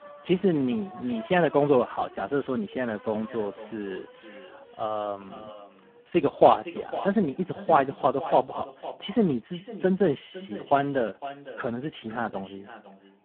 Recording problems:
phone-call audio; poor line
echo of what is said; noticeable; from 3.5 s on; 510 ms later, 15 dB below the speech
traffic noise; faint; throughout; 20 dB below the speech

